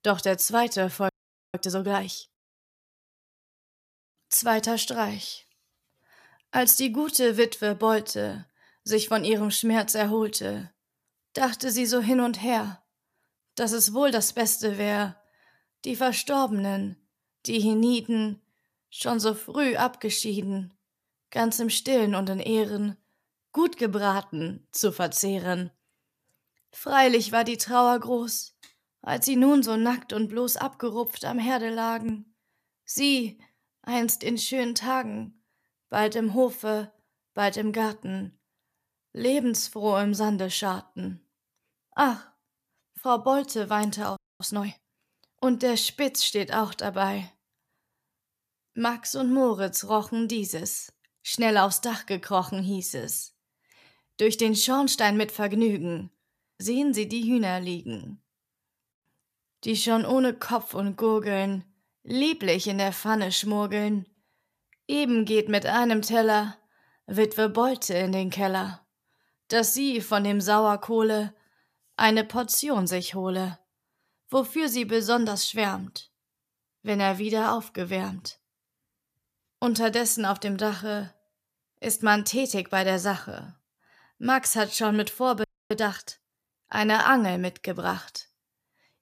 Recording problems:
audio freezing; at 1 s, at 44 s and at 1:25

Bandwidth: 14.5 kHz